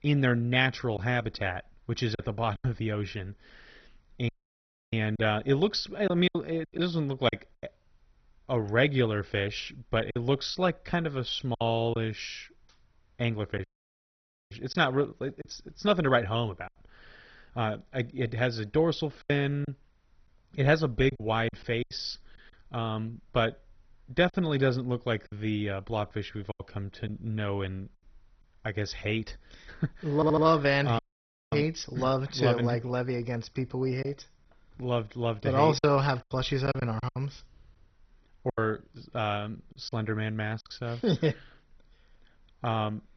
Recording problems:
garbled, watery; badly; nothing above 6 kHz
choppy; very; 5% of the speech affected
audio cutting out; at 4.5 s for 0.5 s, at 14 s for 1 s and at 31 s for 0.5 s
audio stuttering; at 30 s

